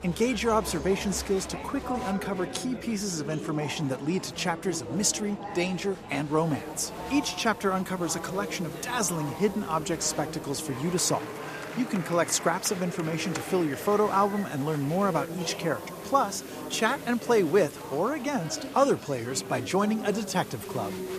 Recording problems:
murmuring crowd; loud; throughout; 10 dB below the speech
hiss; faint; from 6.5 s on; 25 dB below the speech

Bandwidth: 14.5 kHz